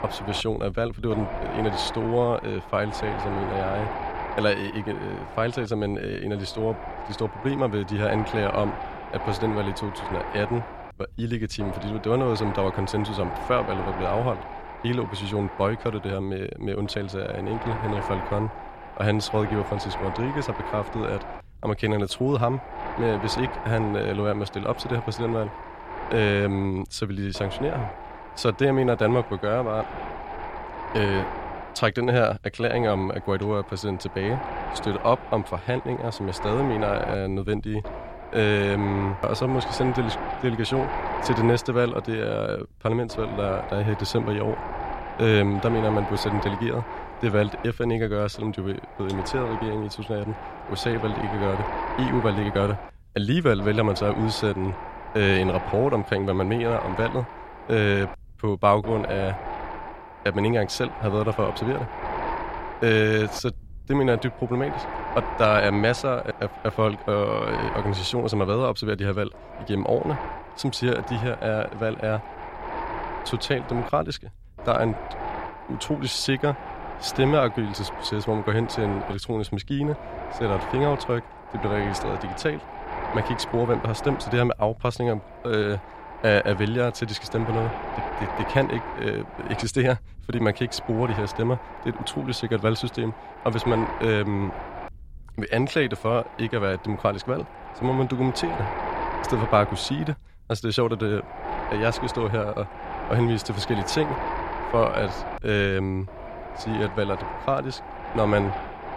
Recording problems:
wind noise on the microphone; heavy; 6 dB below the speech

